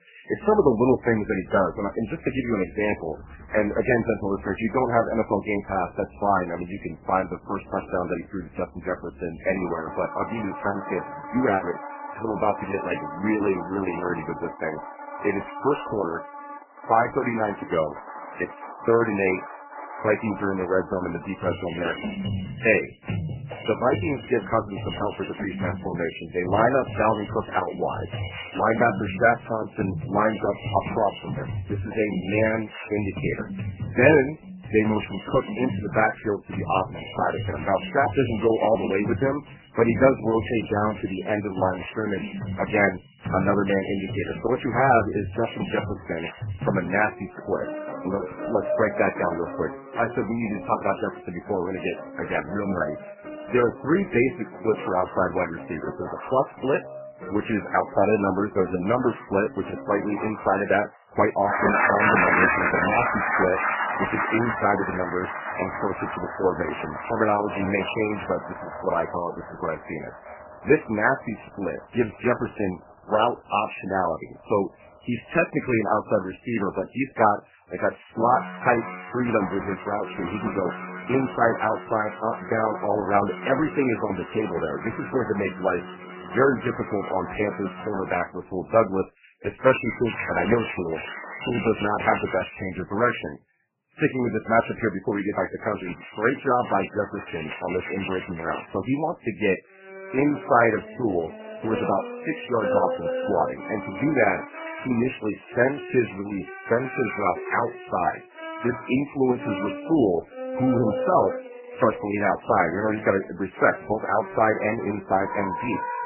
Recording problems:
garbled, watery; badly; nothing above 2.5 kHz
background music; loud; throughout; 8 dB below the speech

